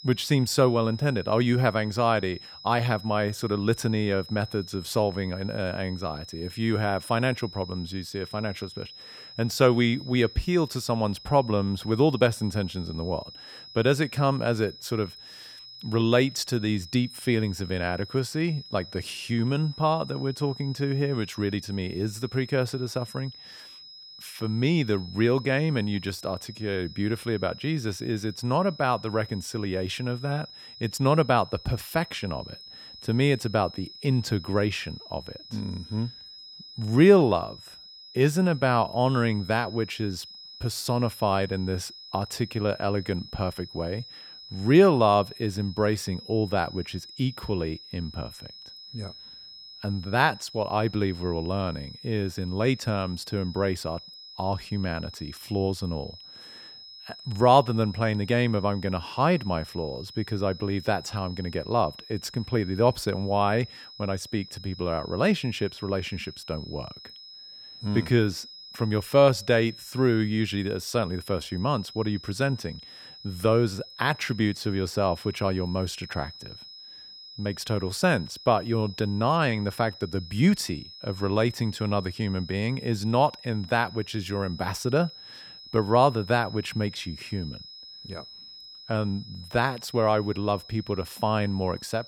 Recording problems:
high-pitched whine; noticeable; throughout; 5 kHz, 15 dB below the speech

